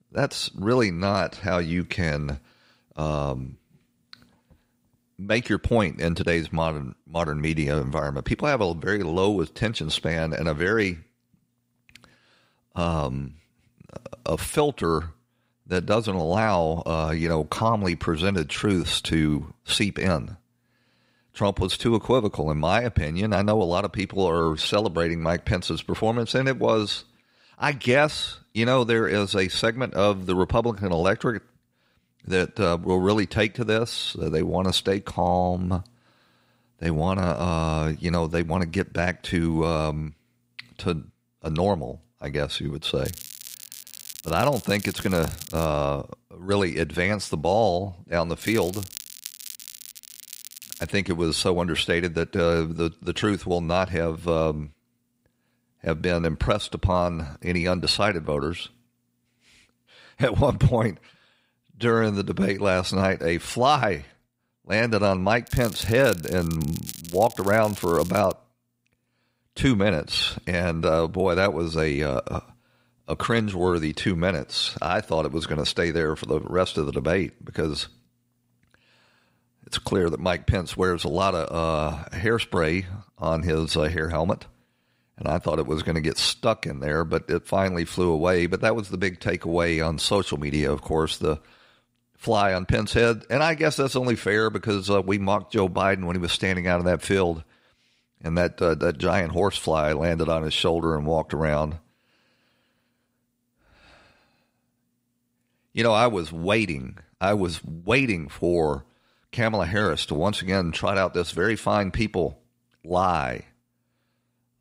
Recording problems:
crackling; noticeable; from 43 to 46 s, from 48 to 51 s and from 1:05 to 1:08; 15 dB below the speech

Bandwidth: 15.5 kHz